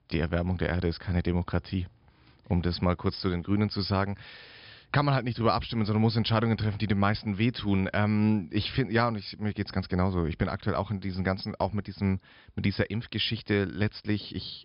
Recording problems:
high frequencies cut off; noticeable; nothing above 5 kHz

